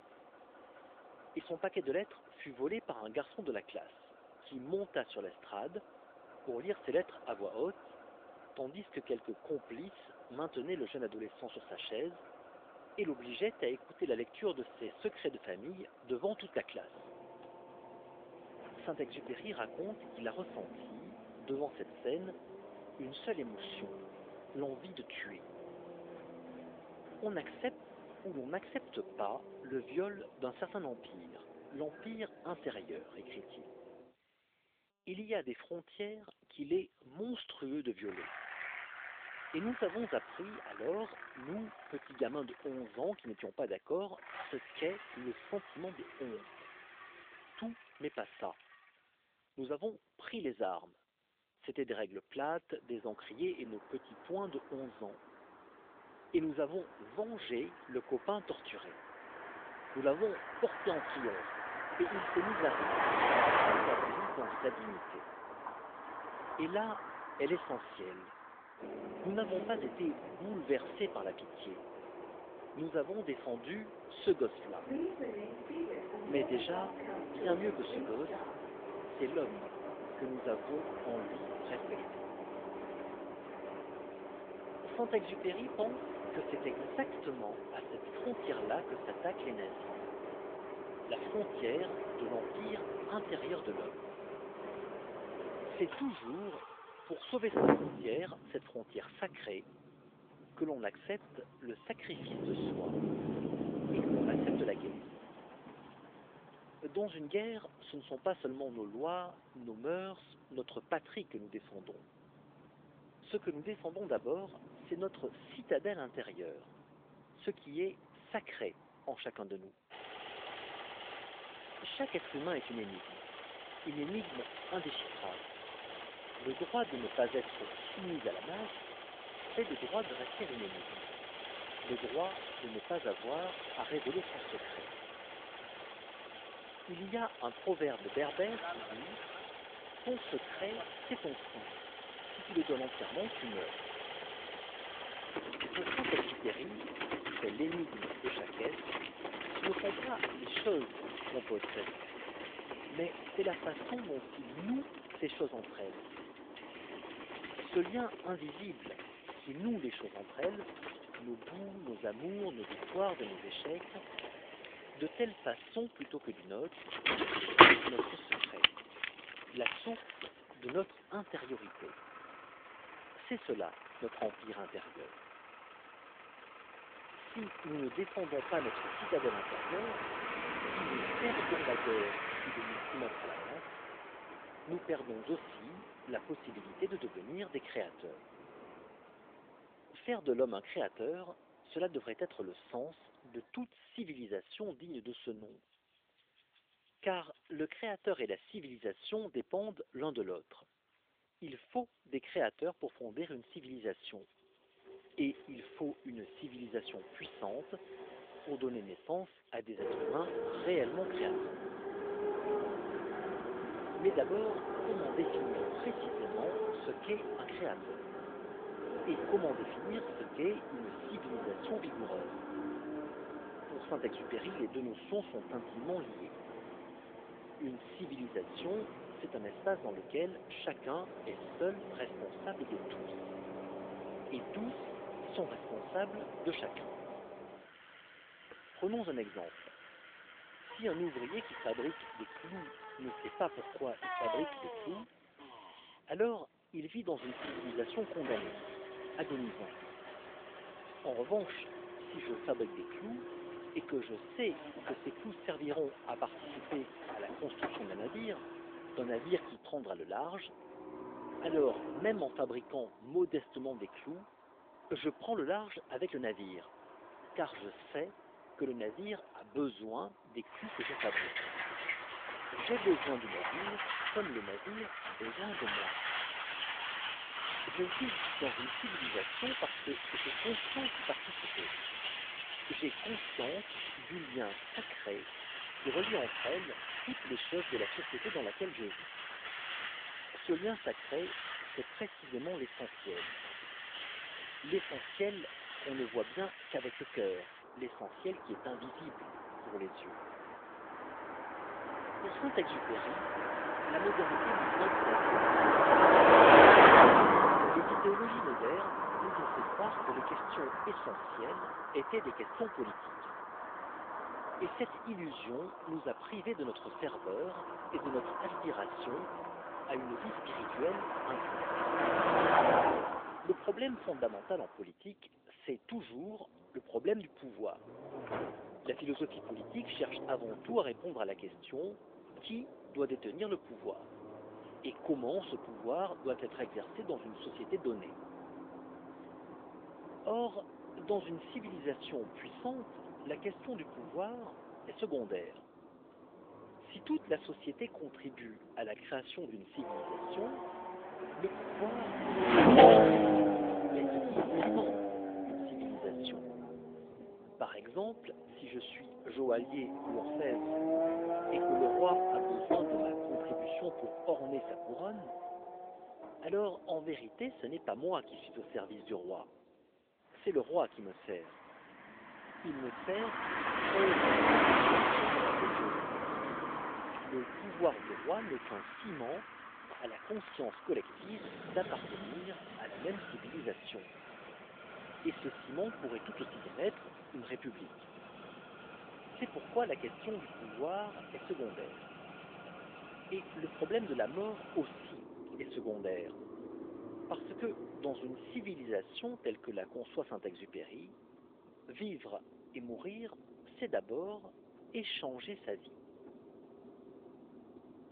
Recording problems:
phone-call audio
traffic noise; very loud; throughout; 6 dB above the speech

